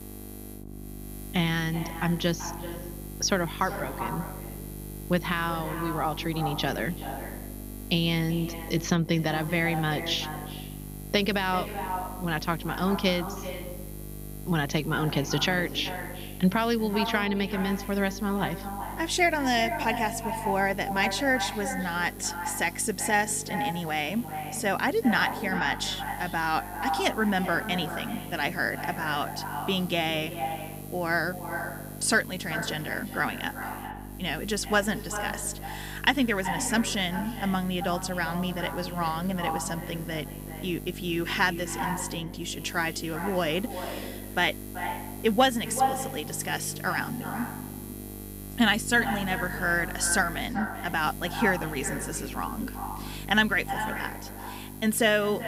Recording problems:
echo of what is said; strong; throughout; 380 ms later, 9 dB below the speech
electrical hum; noticeable; throughout; 50 Hz, 20 dB below the speech

